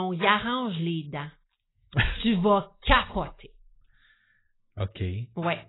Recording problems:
garbled, watery; badly; nothing above 4 kHz
abrupt cut into speech; at the start

